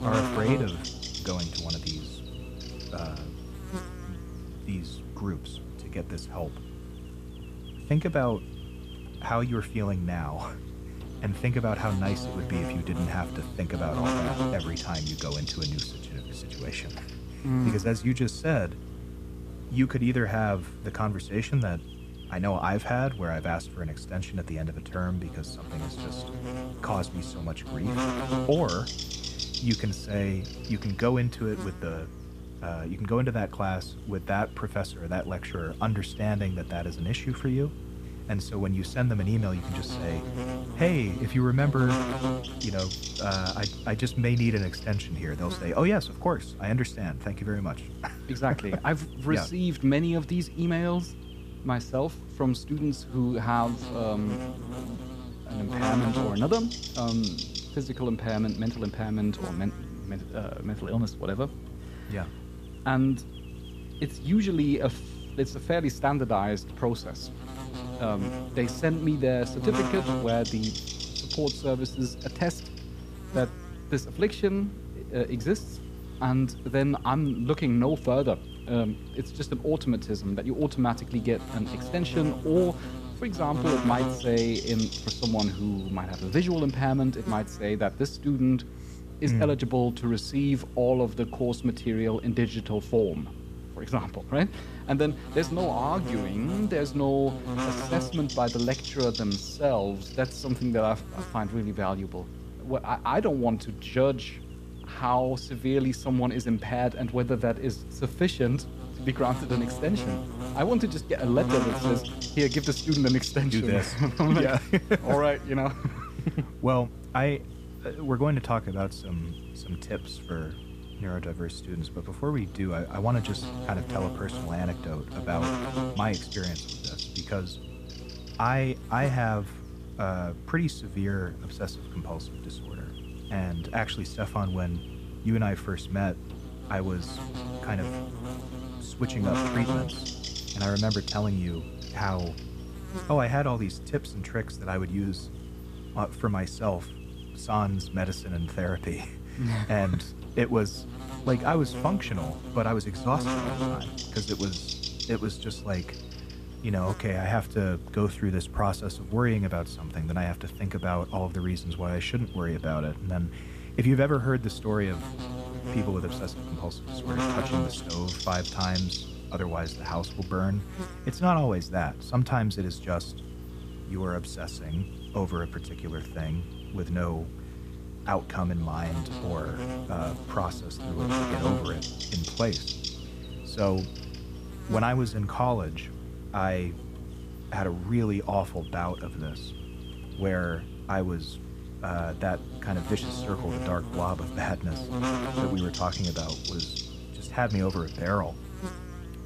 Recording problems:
electrical hum; loud; throughout; 60 Hz, 8 dB below the speech

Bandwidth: 14.5 kHz